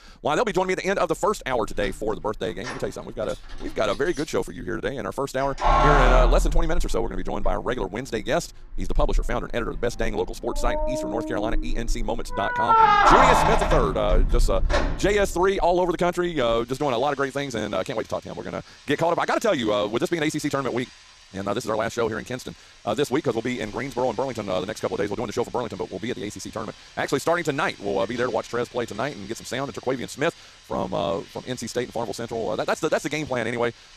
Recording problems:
wrong speed, natural pitch; too fast; 1.7 times normal speed
household noises; very loud; throughout; 3 dB above the speech

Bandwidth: 14 kHz